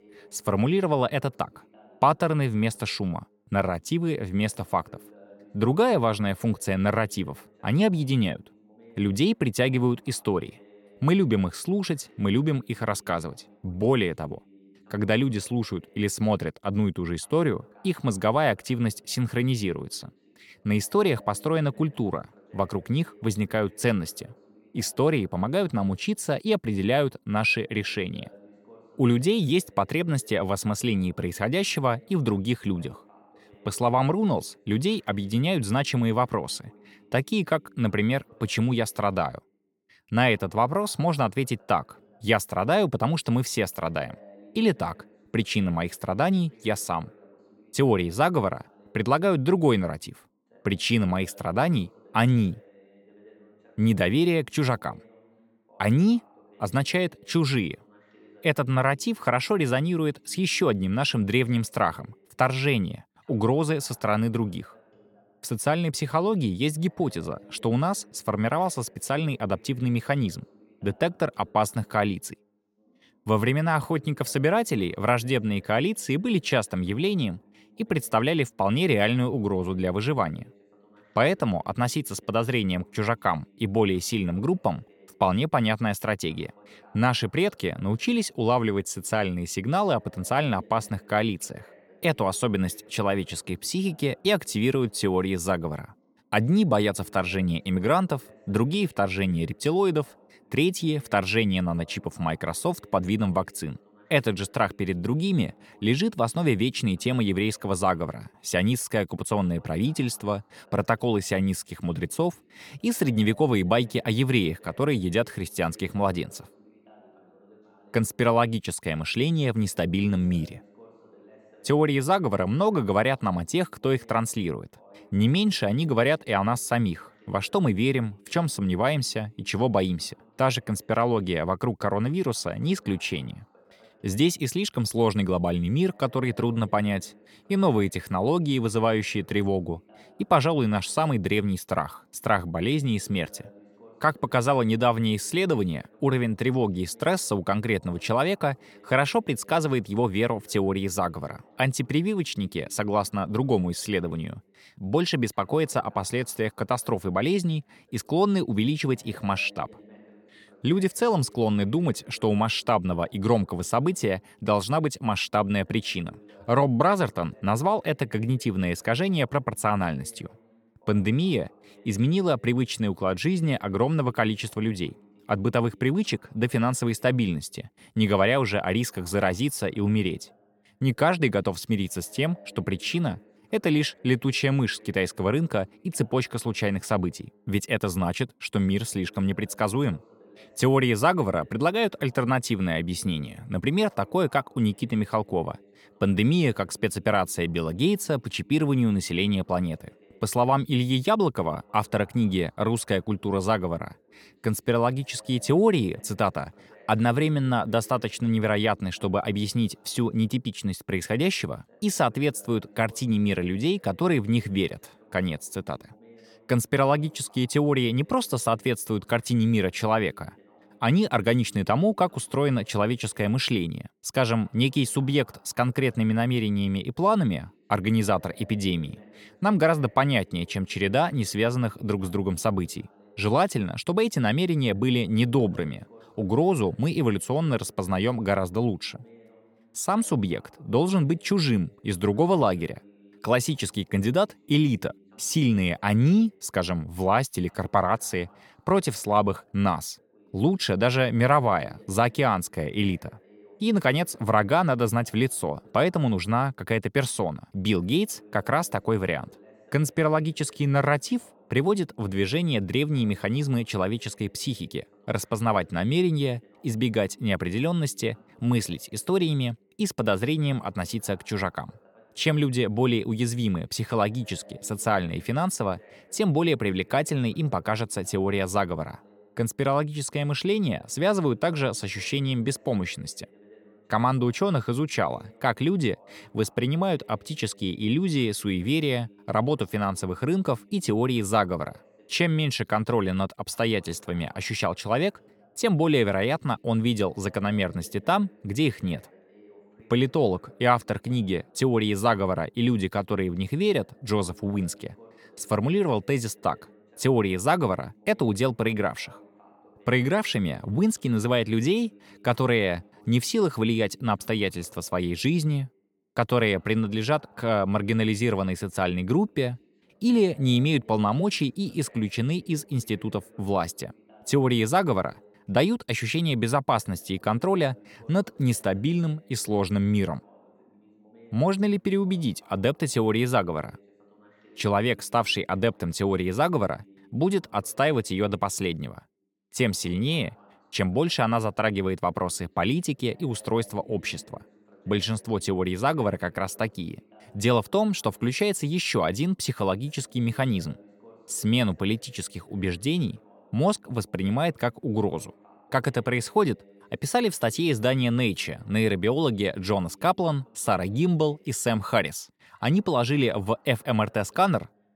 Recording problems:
voice in the background; faint; throughout; 30 dB below the speech

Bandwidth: 17.5 kHz